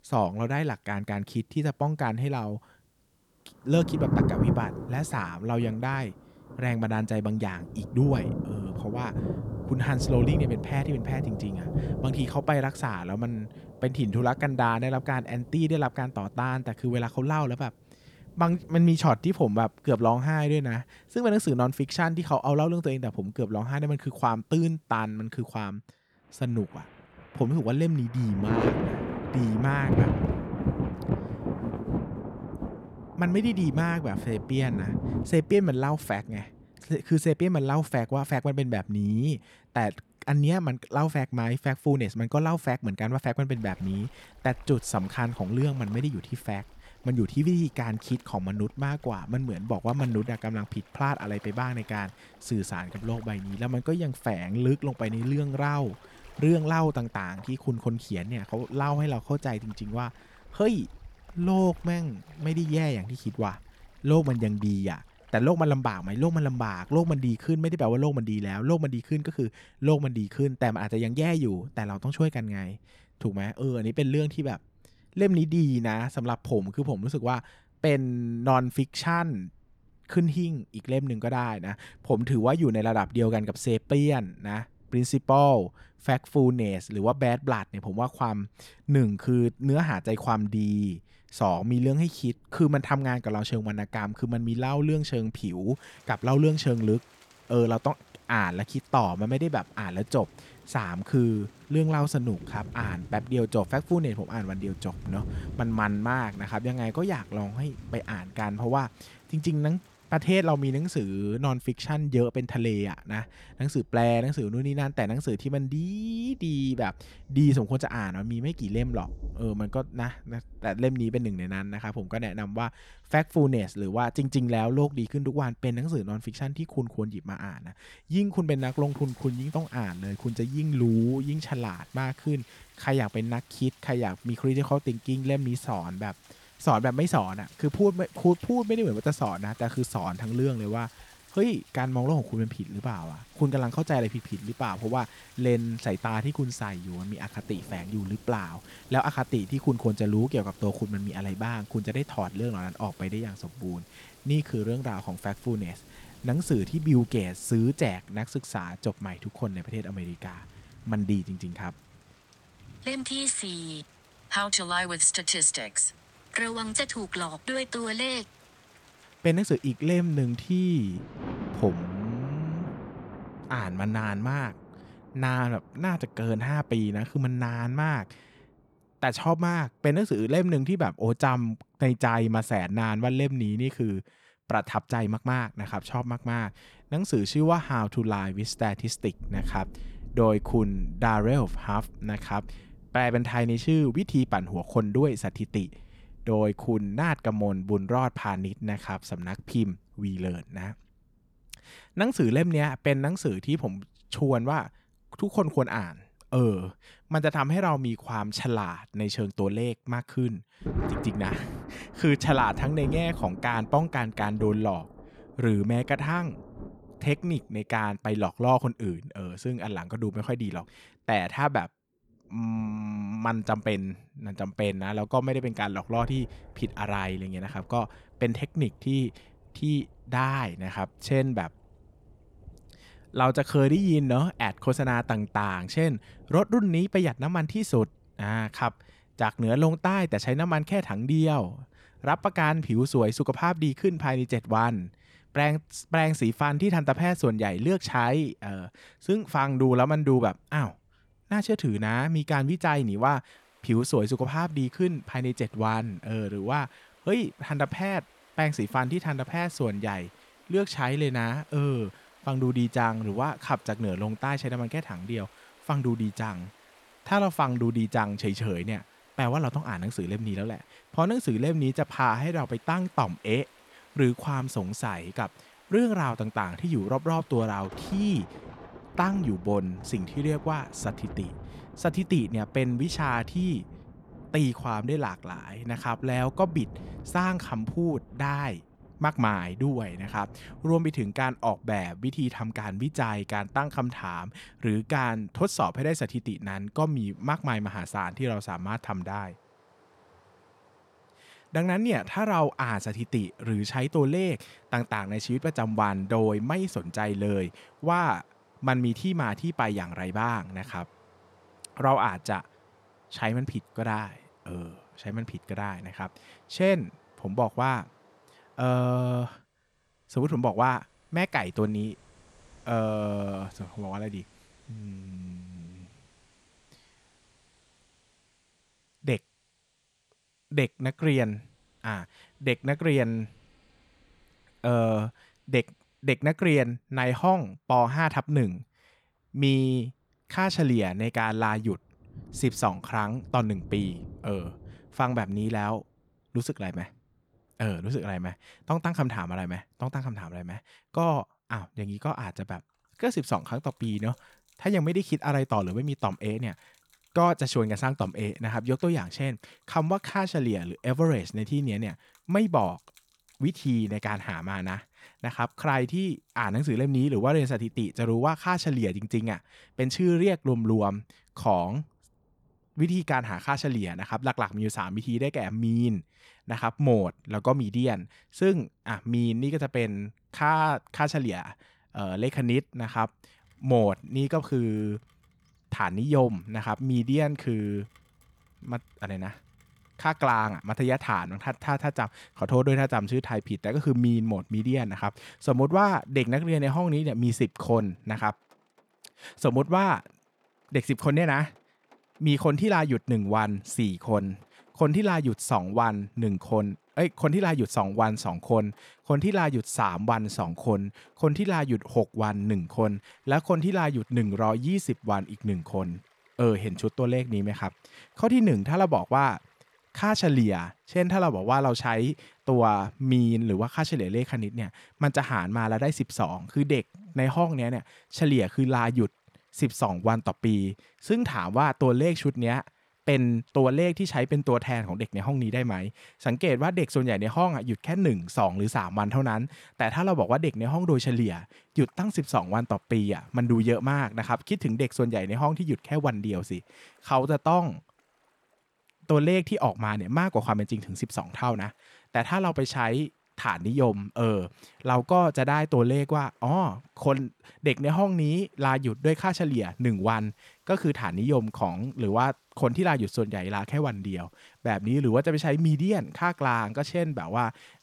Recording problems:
rain or running water; noticeable; throughout; 10 dB below the speech

